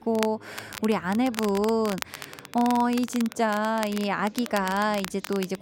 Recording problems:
crackle, like an old record; noticeable; 10 dB below the speech
chatter from many people; faint; throughout; 25 dB below the speech

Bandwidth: 16 kHz